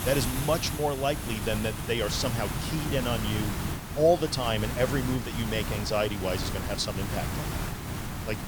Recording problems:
hiss; loud; throughout; 4 dB below the speech

